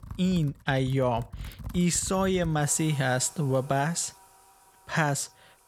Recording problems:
household noises; noticeable; throughout; 20 dB below the speech

